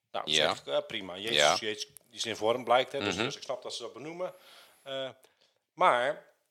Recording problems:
thin; very; fading below 500 Hz

